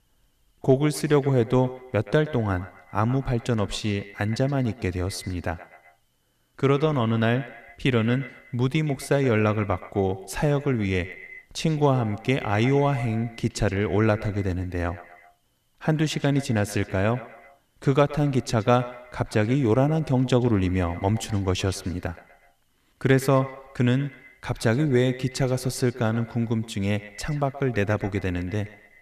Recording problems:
echo of what is said; noticeable; throughout; 120 ms later, 15 dB below the speech

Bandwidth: 14.5 kHz